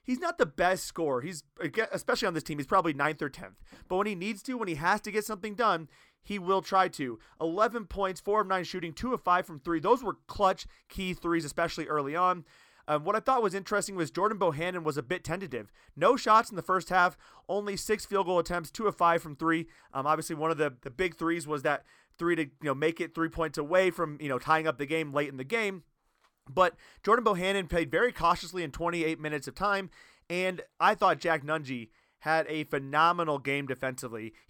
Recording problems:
none

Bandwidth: 18 kHz